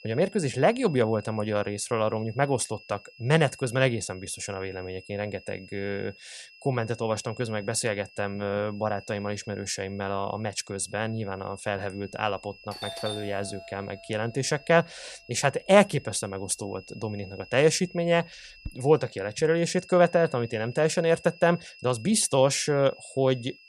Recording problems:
high-pitched whine; faint; throughout; 2.5 kHz, 20 dB below the speech
doorbell; noticeable; from 13 to 19 s; peak 8 dB below the speech

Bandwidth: 15 kHz